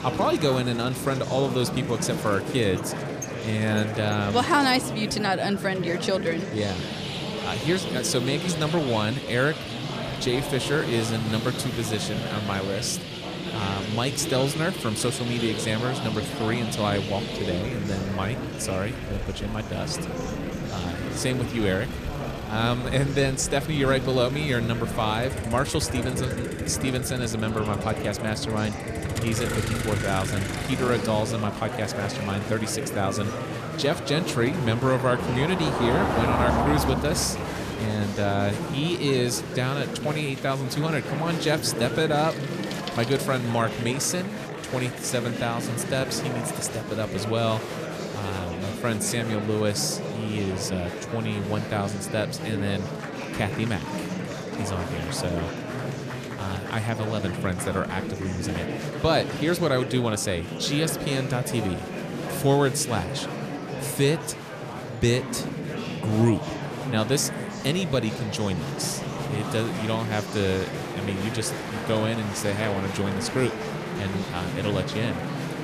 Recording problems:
traffic noise; loud; until 43 s; 7 dB below the speech
murmuring crowd; loud; throughout; 5 dB below the speech

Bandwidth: 14.5 kHz